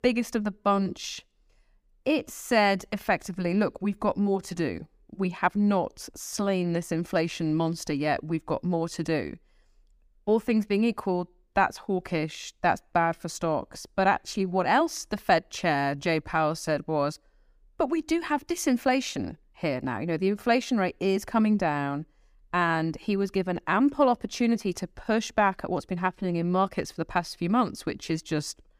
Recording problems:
none

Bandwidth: 15 kHz